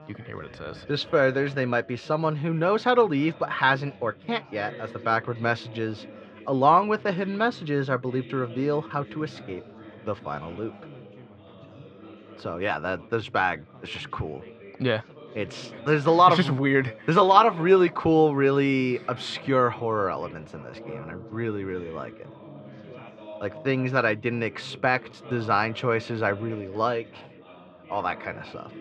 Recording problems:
muffled; slightly; fading above 4 kHz
background chatter; noticeable; throughout; 3 voices, 20 dB below the speech

